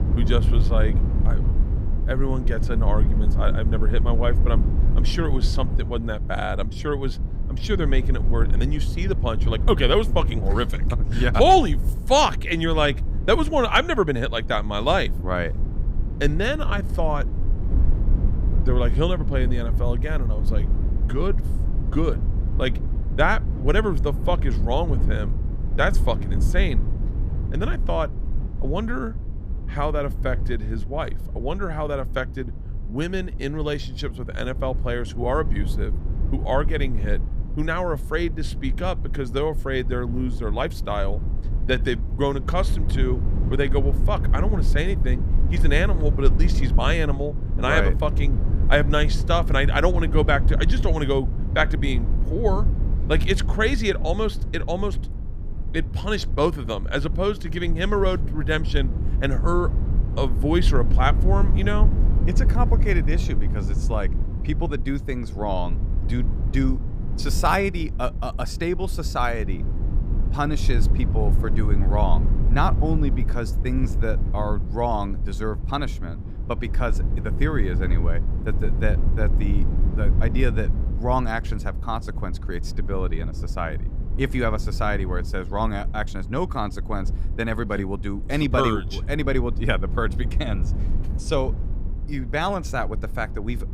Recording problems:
low rumble; noticeable; throughout; 15 dB below the speech

